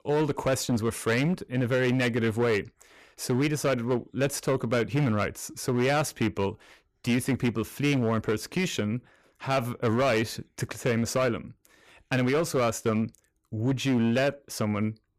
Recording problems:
distortion; slight; 11% of the sound clipped

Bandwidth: 14.5 kHz